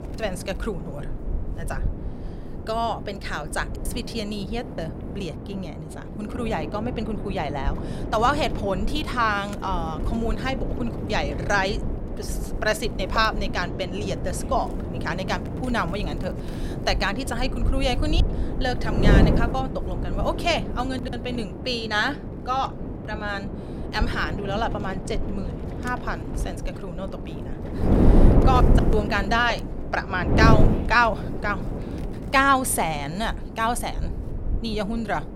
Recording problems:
wind noise on the microphone; heavy; 9 dB below the speech

